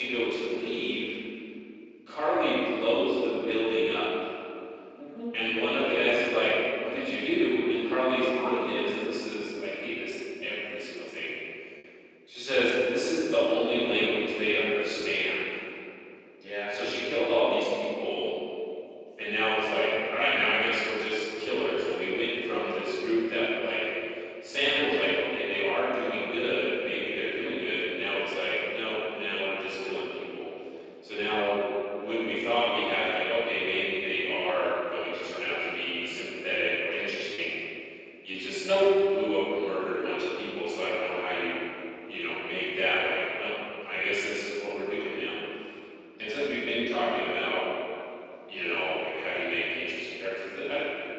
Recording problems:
room echo; strong; dies away in 2.4 s
off-mic speech; far
thin; somewhat; fading below 350 Hz
garbled, watery; slightly; nothing above 7.5 kHz
abrupt cut into speech; at the start
choppy; occasionally; from 37 to 38 s; 2% of the speech affected

